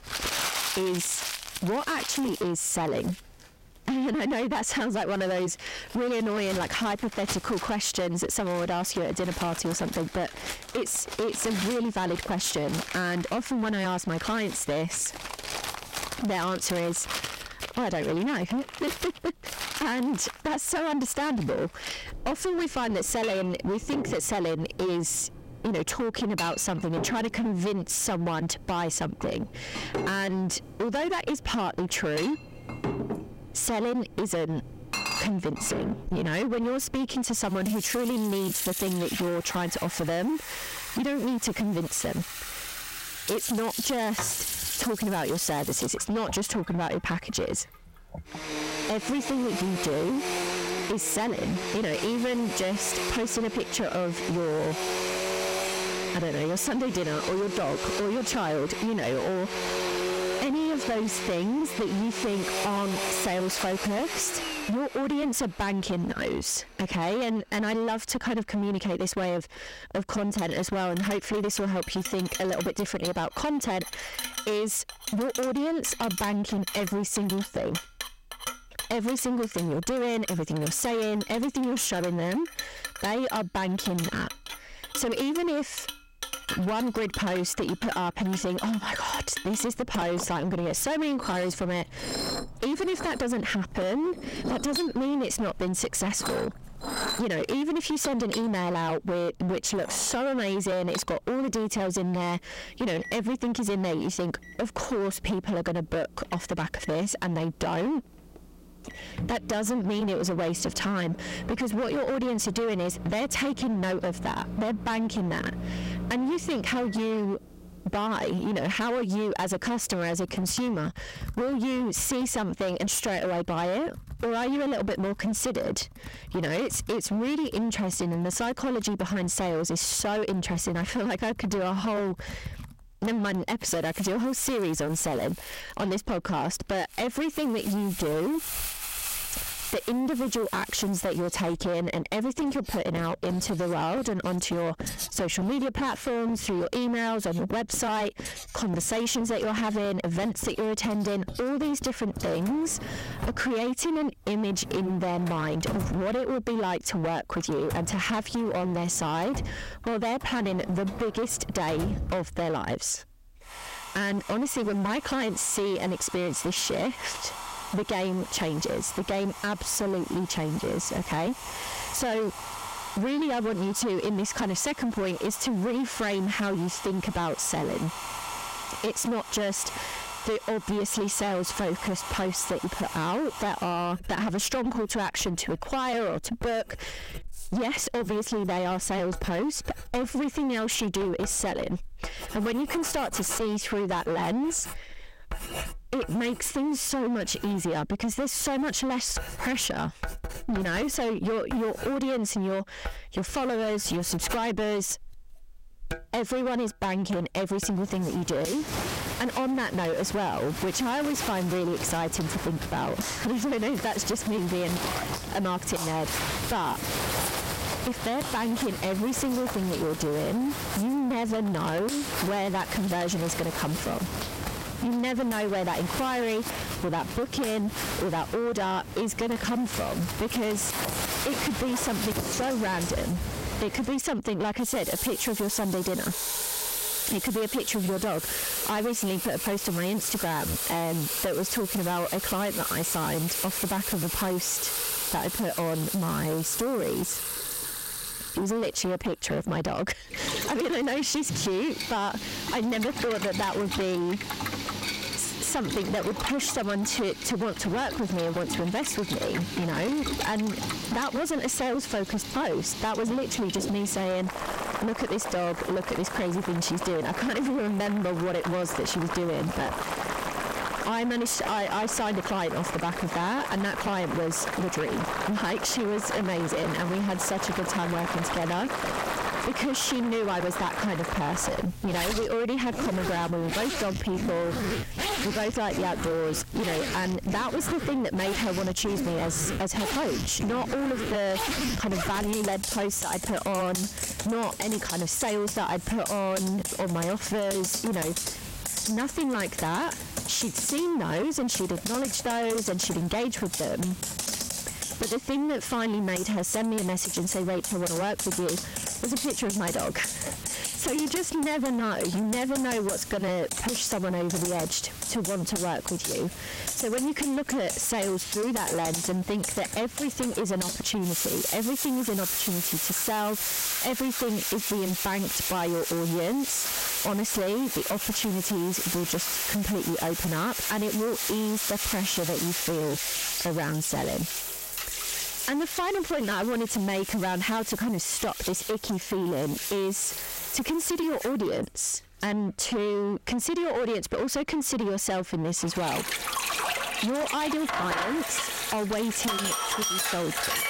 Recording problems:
distortion; heavy; 24% of the sound clipped
squashed, flat; somewhat, background pumping
household noises; loud; throughout; 5 dB below the speech

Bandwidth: 16 kHz